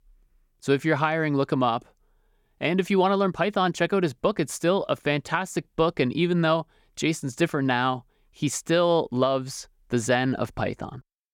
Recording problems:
none

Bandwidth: 18 kHz